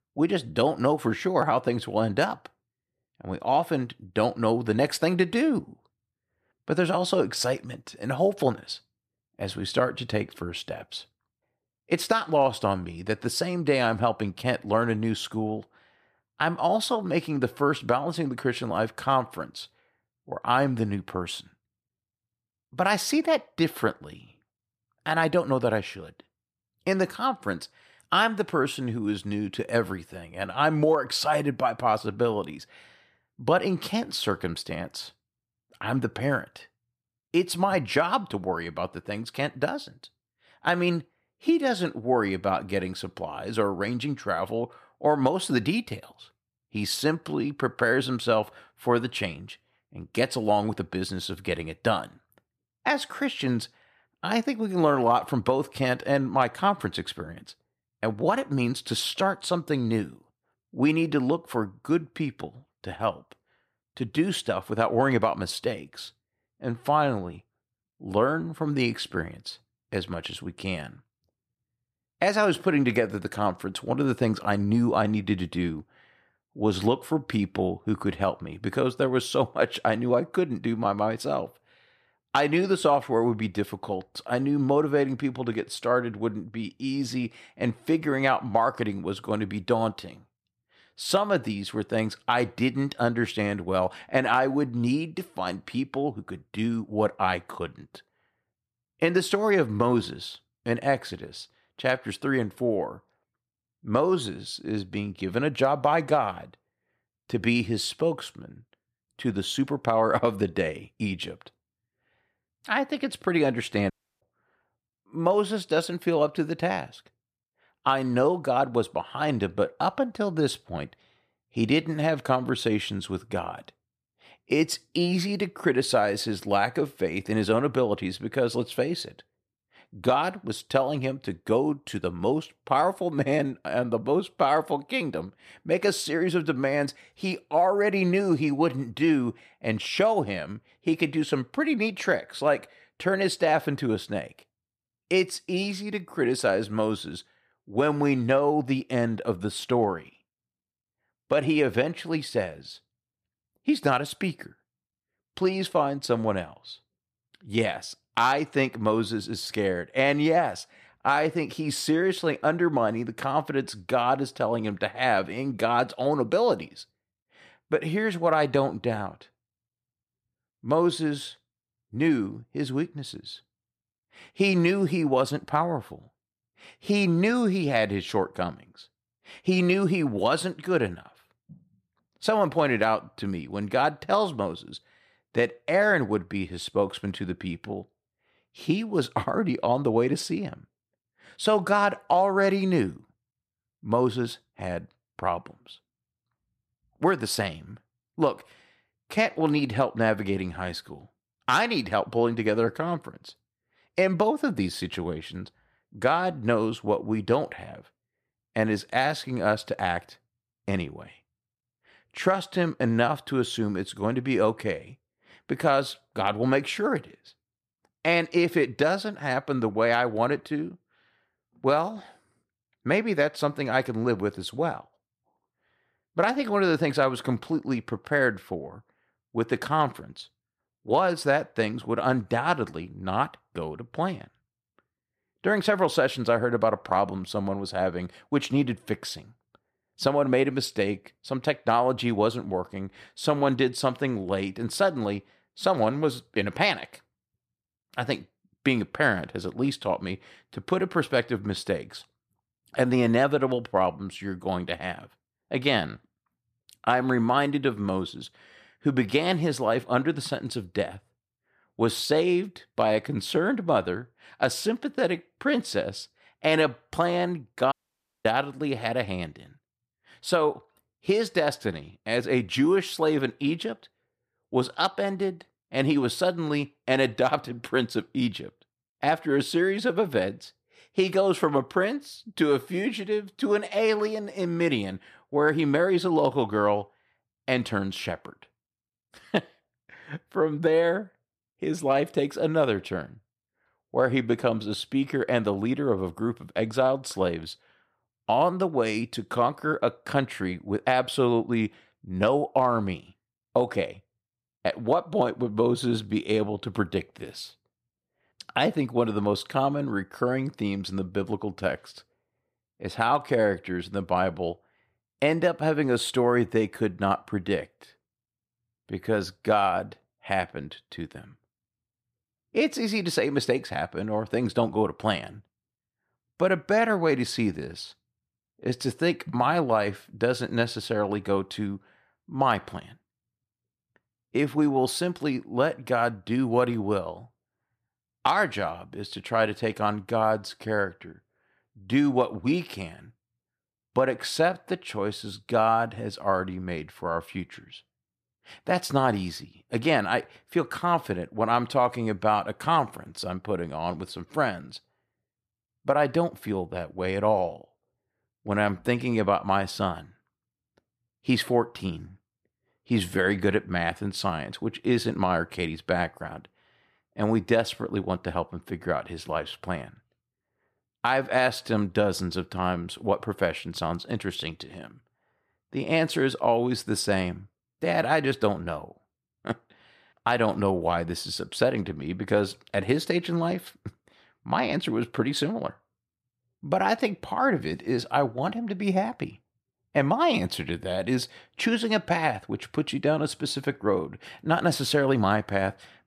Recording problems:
audio cutting out; at 1:54 and at 4:28 for 0.5 s

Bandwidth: 14.5 kHz